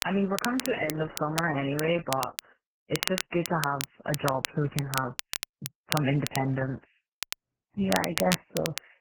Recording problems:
garbled, watery; badly; nothing above 3 kHz
crackle, like an old record; loud; 6 dB below the speech

